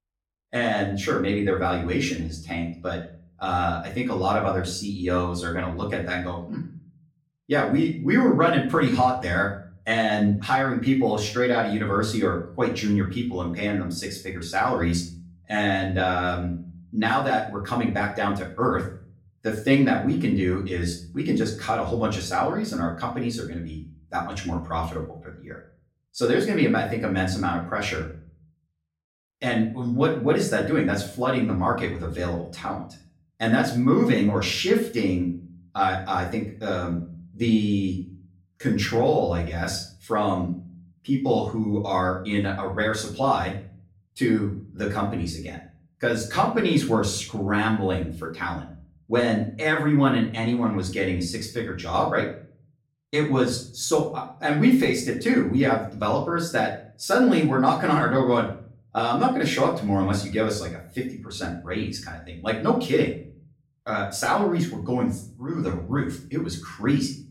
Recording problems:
off-mic speech; far
room echo; slight; dies away in 0.4 s

